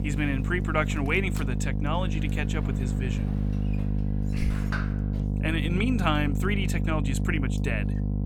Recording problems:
electrical hum; loud; throughout; 50 Hz, 8 dB below the speech
household noises; noticeable; throughout; 15 dB below the speech

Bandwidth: 17 kHz